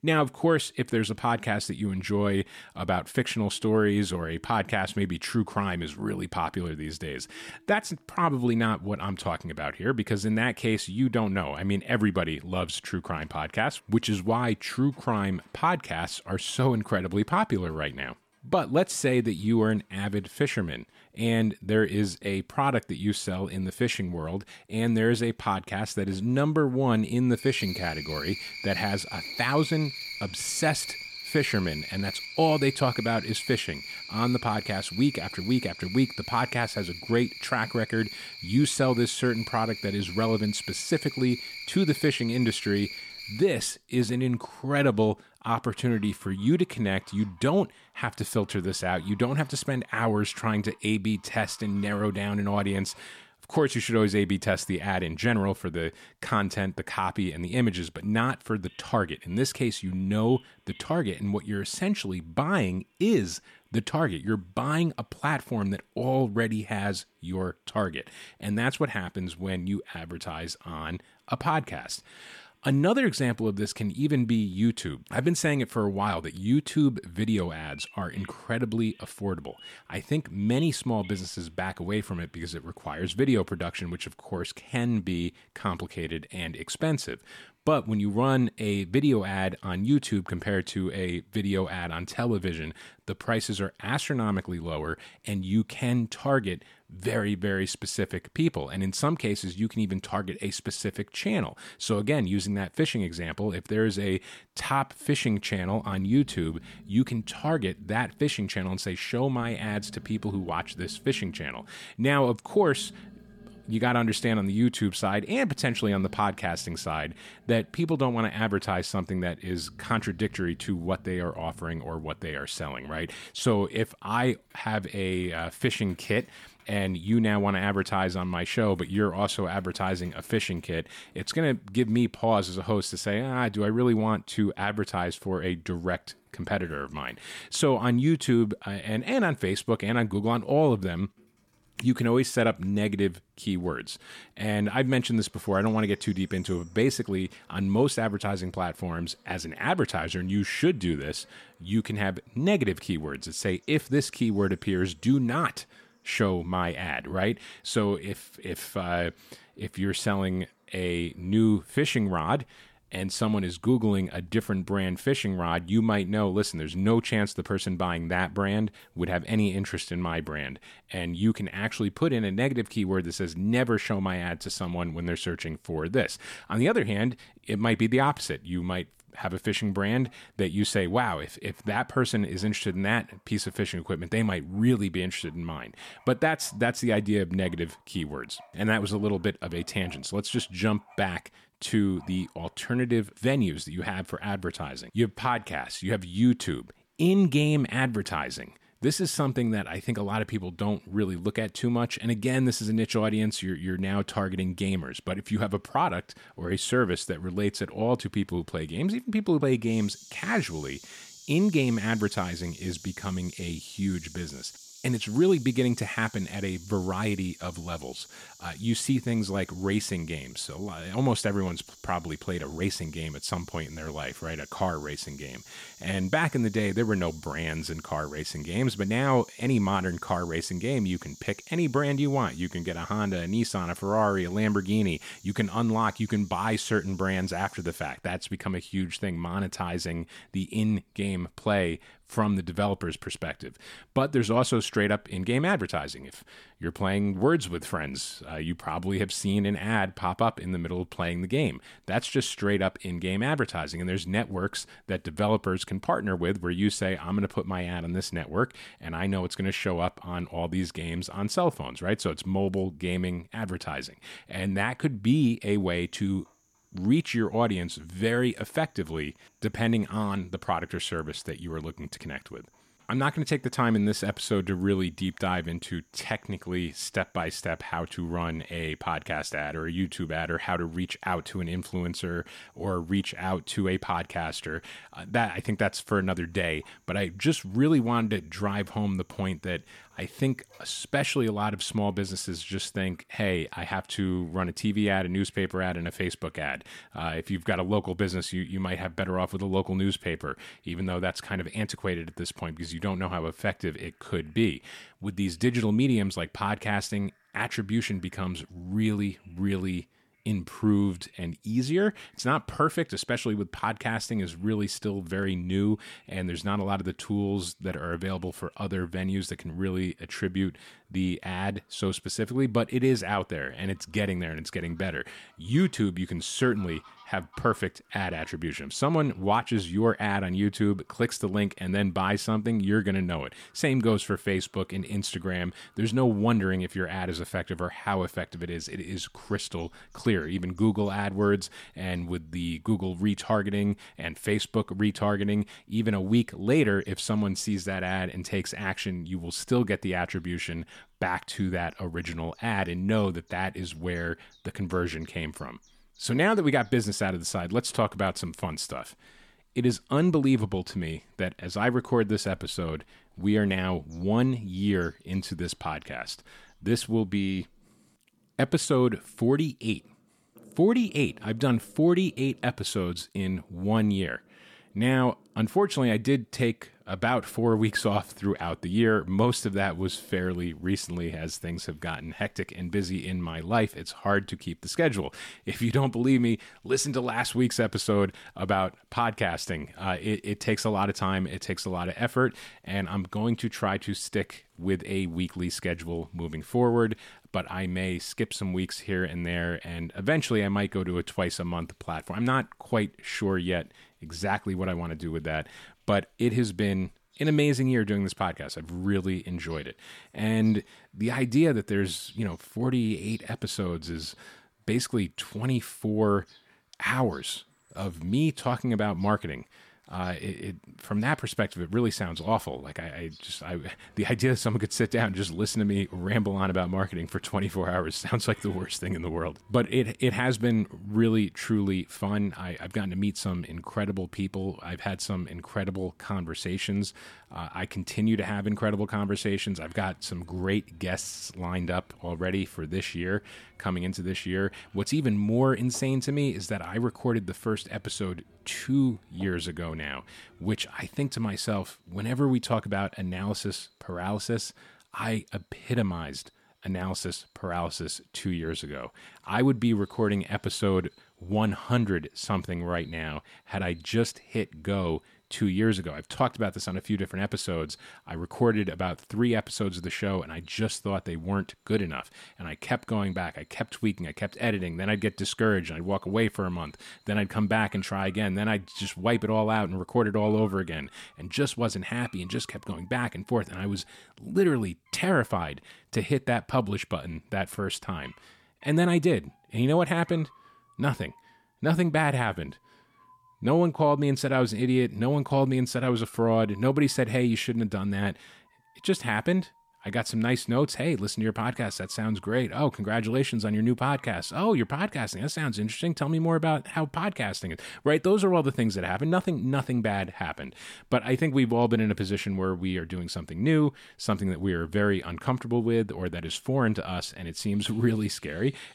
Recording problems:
animal sounds; noticeable; throughout; 15 dB below the speech

